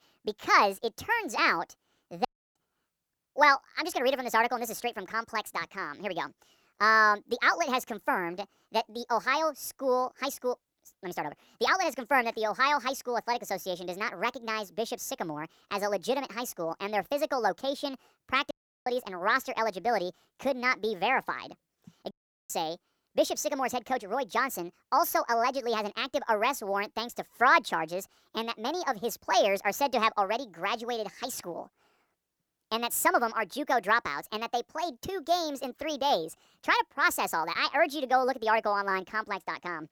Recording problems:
wrong speed and pitch; too fast and too high; 1.5 times normal speed
audio cutting out; at 2.5 s, at 19 s and at 22 s

